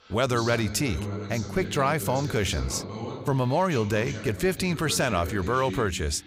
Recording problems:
voice in the background; loud; throughout; 10 dB below the speech

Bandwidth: 15.5 kHz